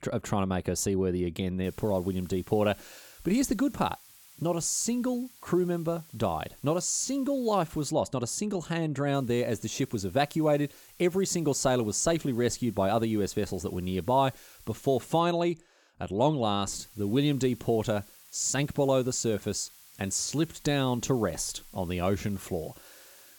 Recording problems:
hiss; faint; from 1.5 to 8 s, from 9 to 15 s and from 17 s on; 25 dB below the speech

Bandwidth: 18 kHz